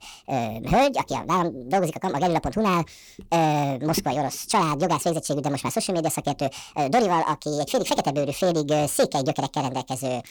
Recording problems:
wrong speed and pitch; too fast and too high; 1.6 times normal speed
distortion; slight; 10 dB below the speech

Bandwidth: 19 kHz